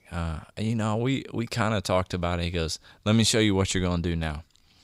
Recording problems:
none

